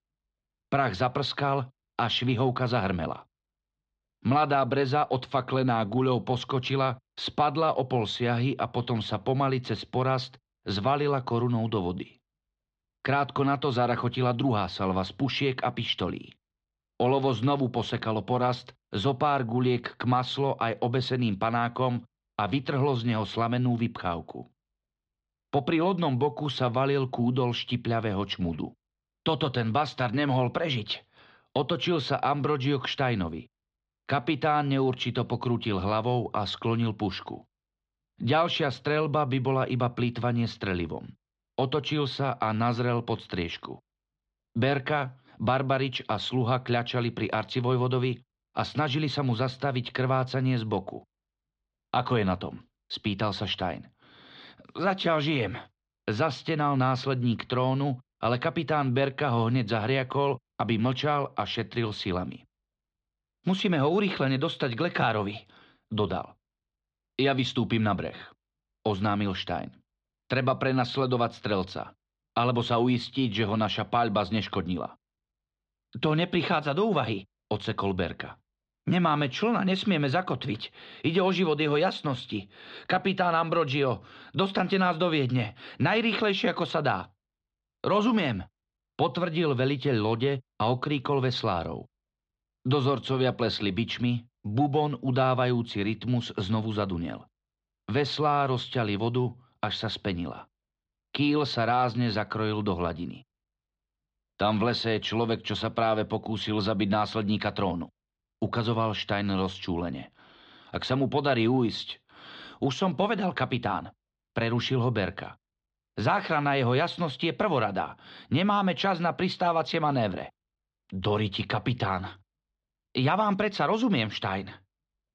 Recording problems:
muffled; very slightly; fading above 4 kHz

